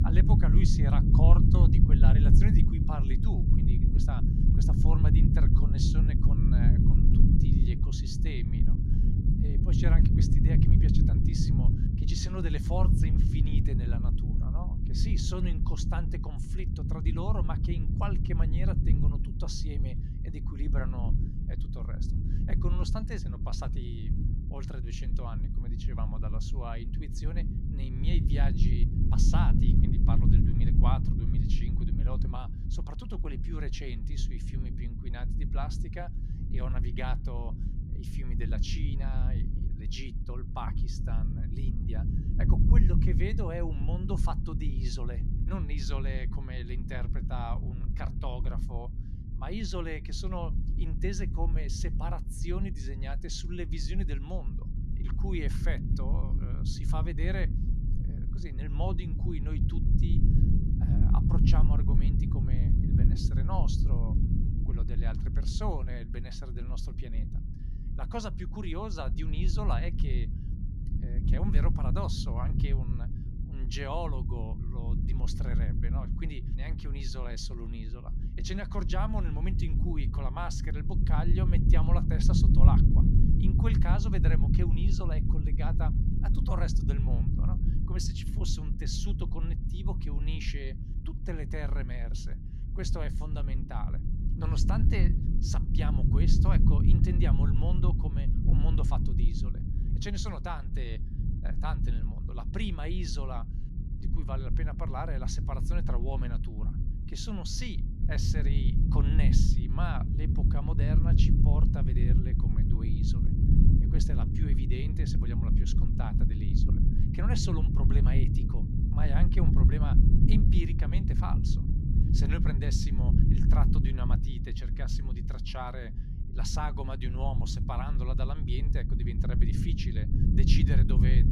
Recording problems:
low rumble; loud; throughout; 1 dB below the speech

